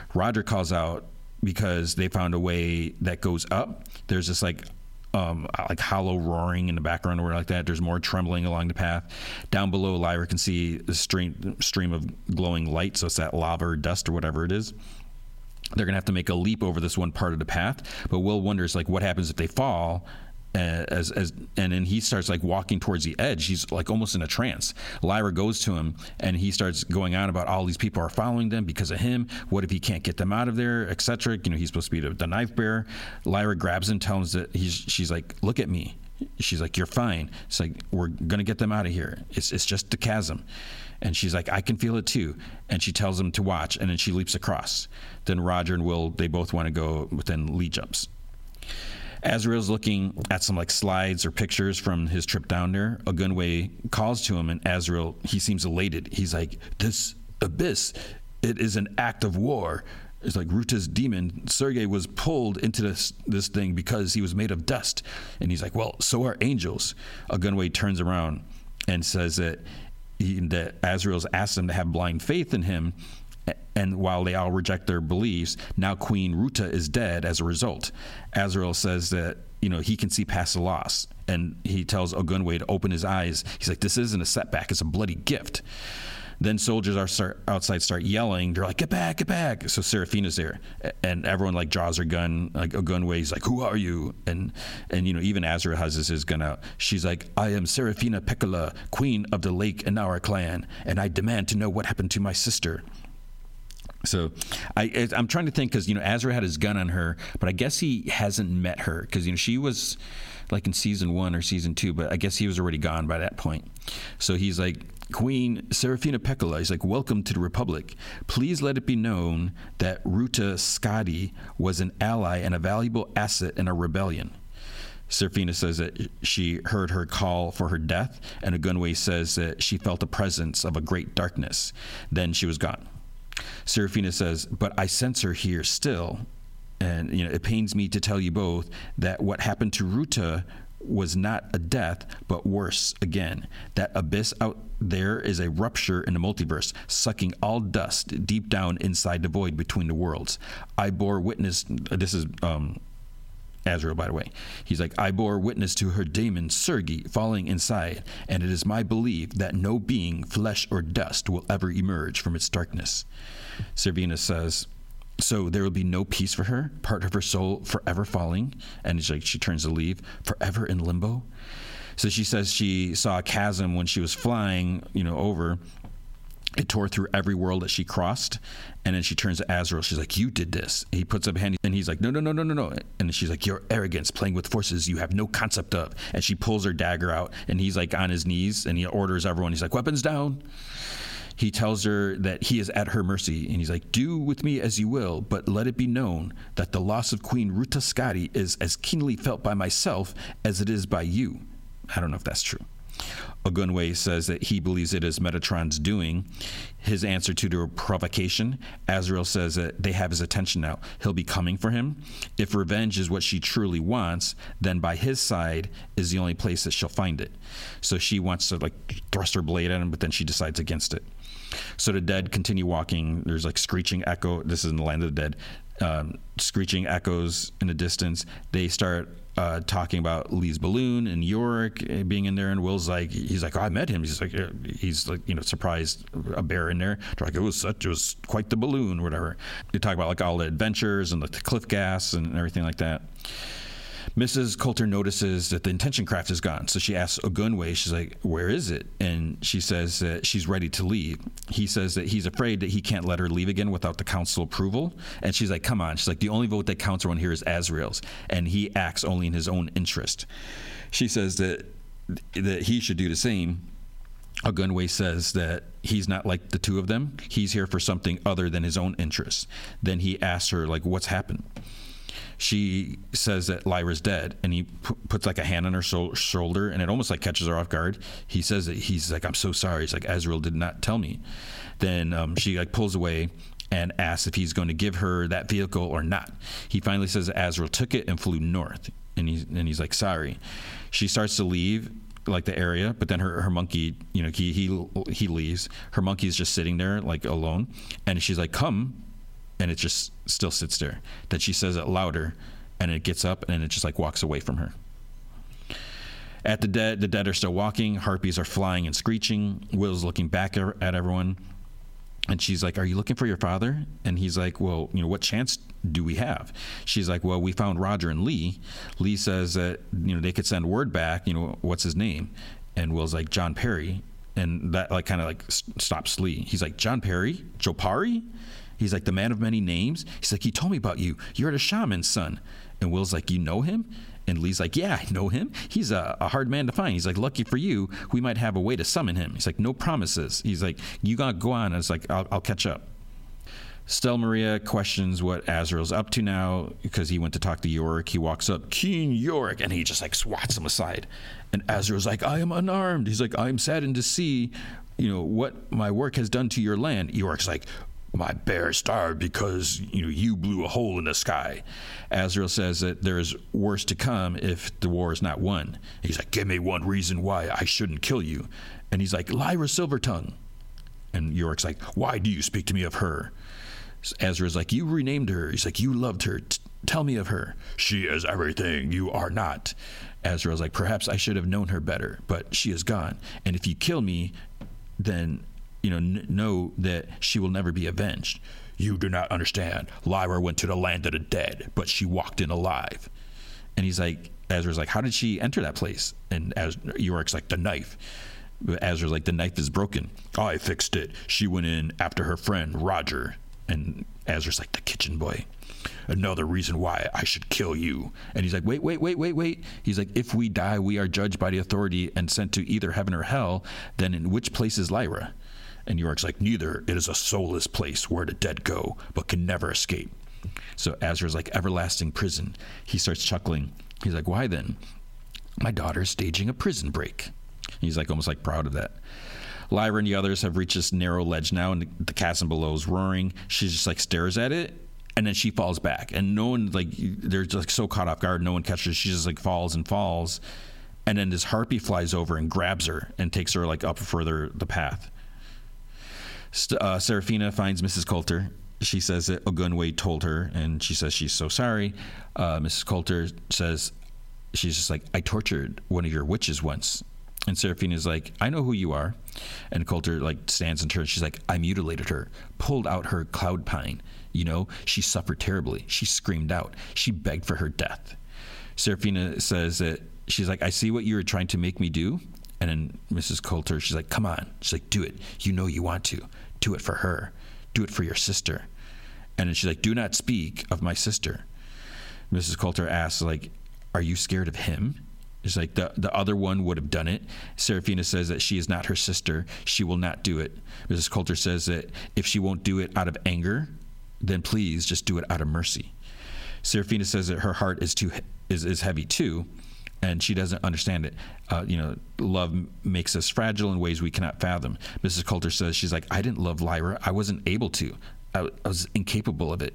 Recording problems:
squashed, flat; heavily

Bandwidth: 16 kHz